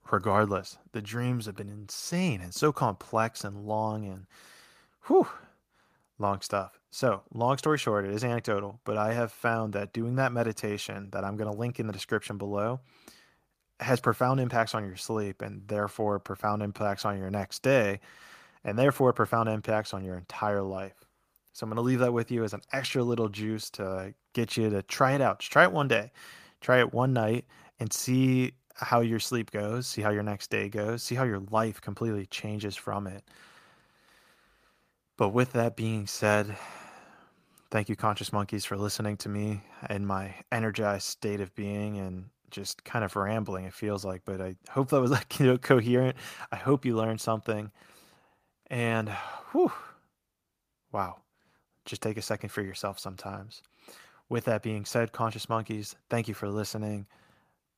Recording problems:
none

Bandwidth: 15 kHz